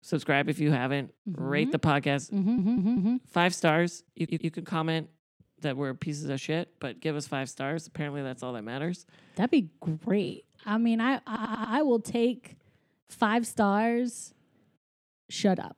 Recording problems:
audio stuttering; at 2.5 s, at 4 s and at 11 s

